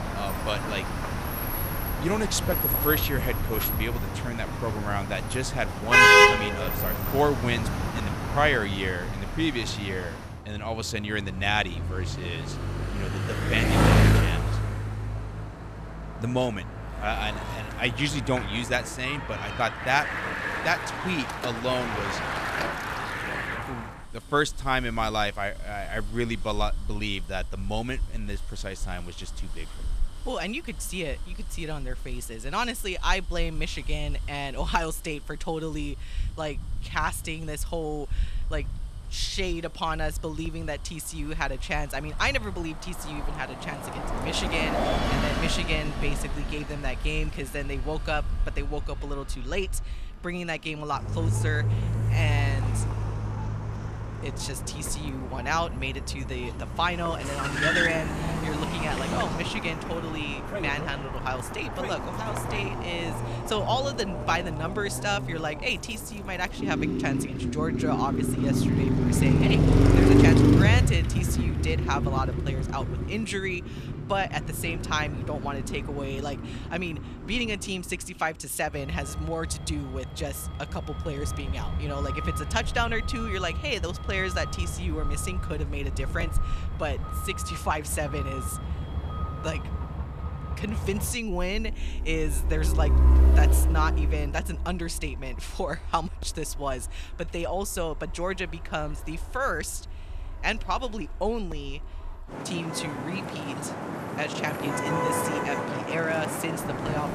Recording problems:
traffic noise; very loud; throughout; 3 dB above the speech

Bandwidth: 14 kHz